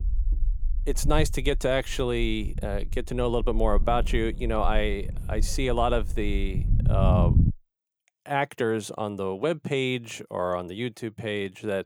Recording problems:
low rumble; noticeable; until 7.5 s; 15 dB below the speech

